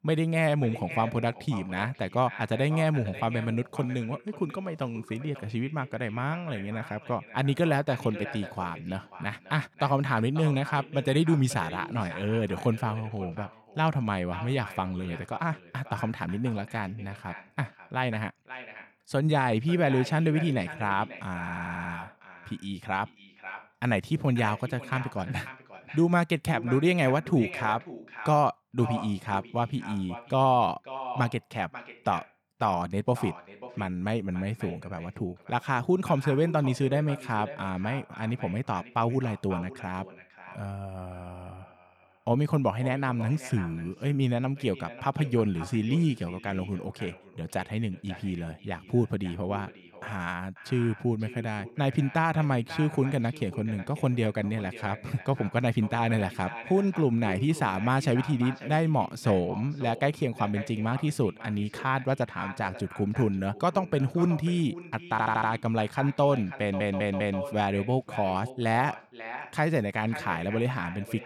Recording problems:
echo of what is said; noticeable; throughout; 540 ms later, 15 dB below the speech
audio stuttering; at 21 s, at 1:05 and at 1:07

